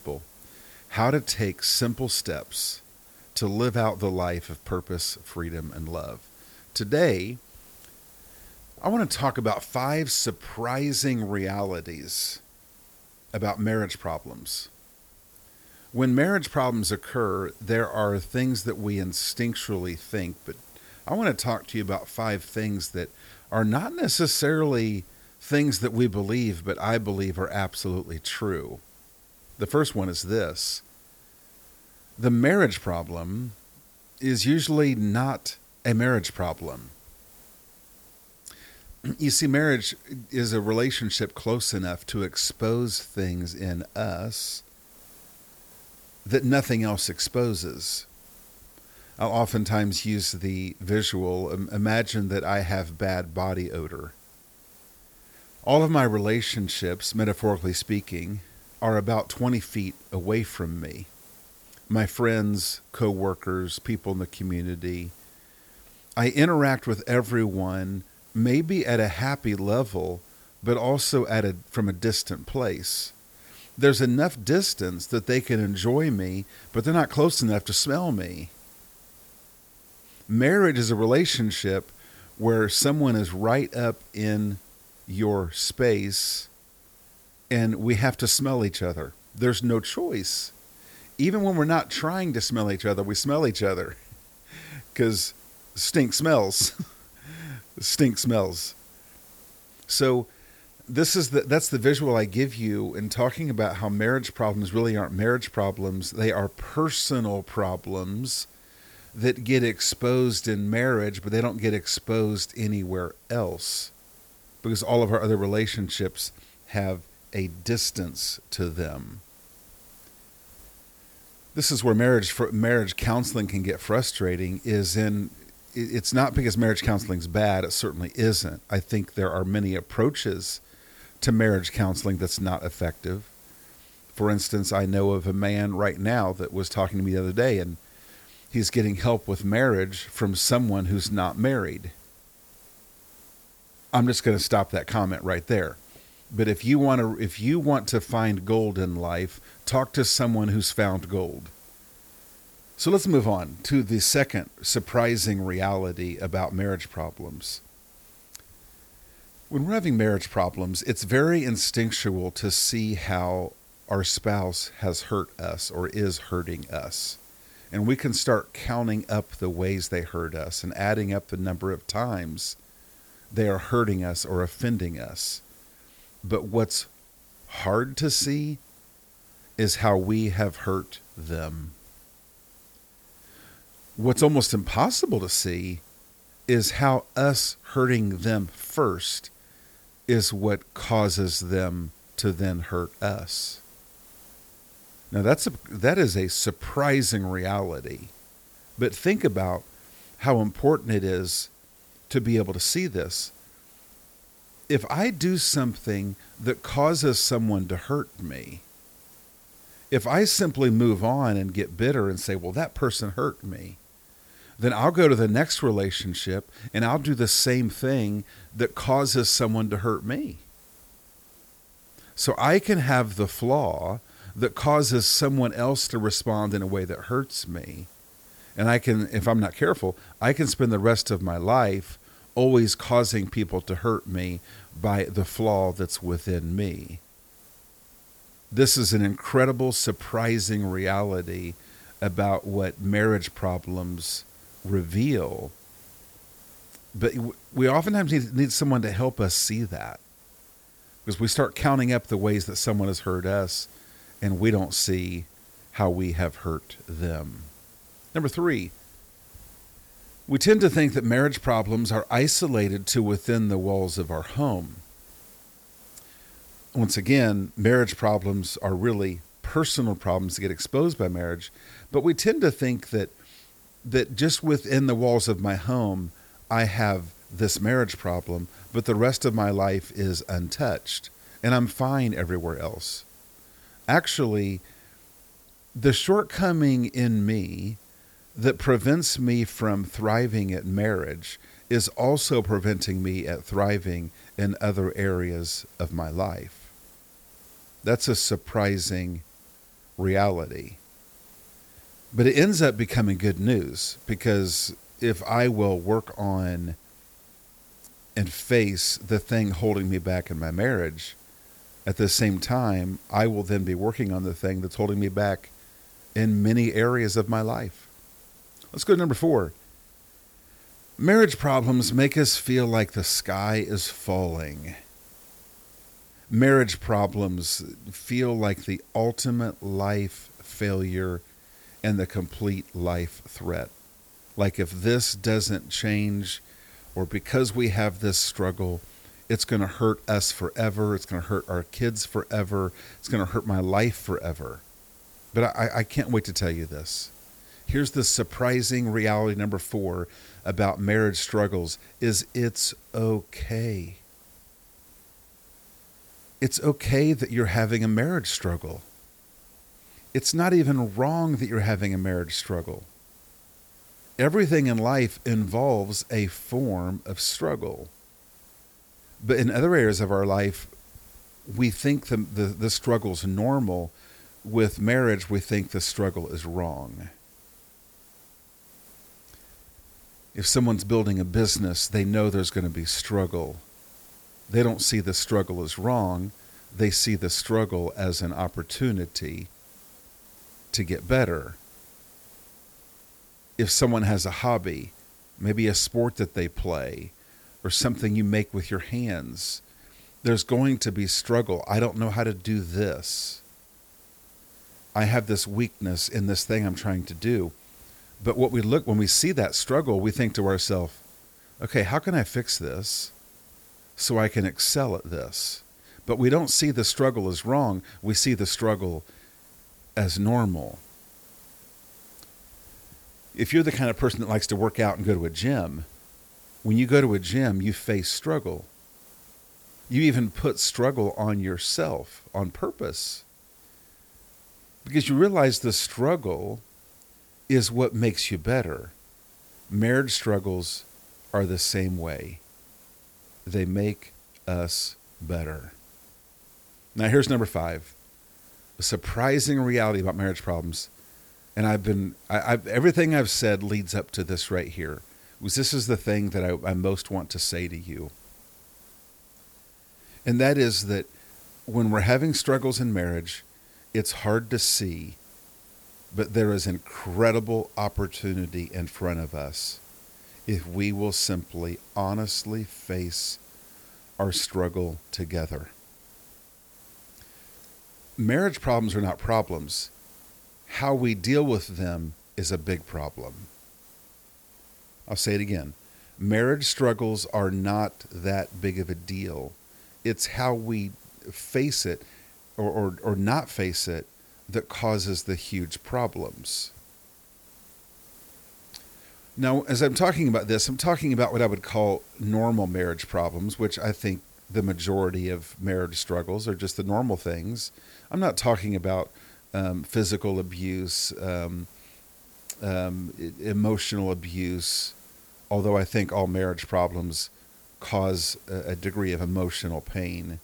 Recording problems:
hiss; faint; throughout; 25 dB below the speech

